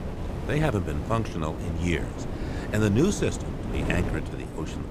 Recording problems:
wind noise on the microphone; heavy; 7 dB below the speech

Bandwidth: 15 kHz